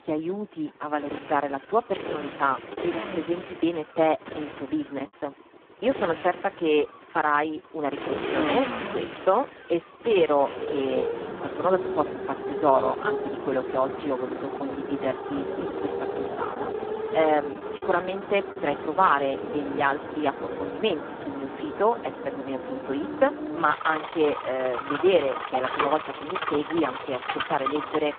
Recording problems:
phone-call audio; poor line
traffic noise; loud; throughout; 6 dB below the speech
choppy; occasionally; at 5 s and from 15 to 19 s; 3% of the speech affected

